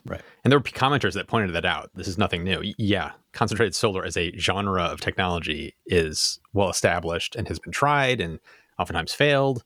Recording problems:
none

